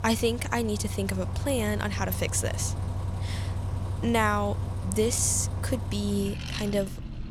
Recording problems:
traffic noise; loud; throughout; 5 dB below the speech

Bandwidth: 18 kHz